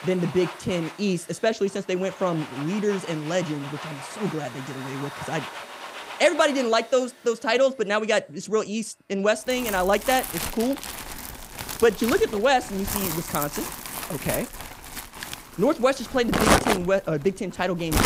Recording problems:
household noises; loud; throughout; 6 dB below the speech

